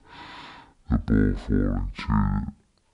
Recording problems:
wrong speed and pitch; too slow and too low; 0.5 times normal speed

